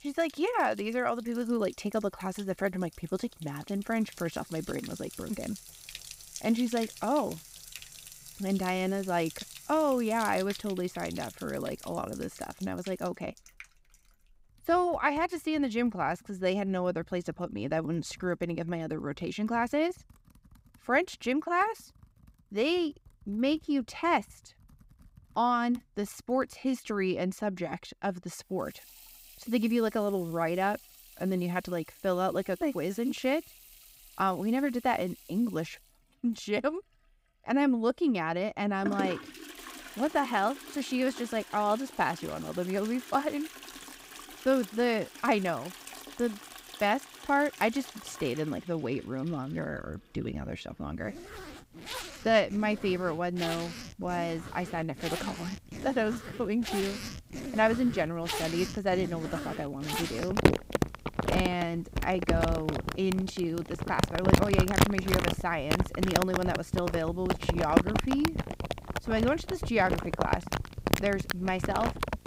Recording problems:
household noises; loud; throughout; 4 dB below the speech

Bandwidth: 15.5 kHz